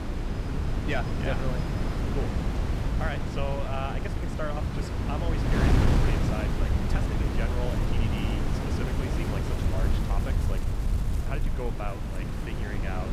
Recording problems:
wind noise on the microphone; heavy; 1 dB above the speech

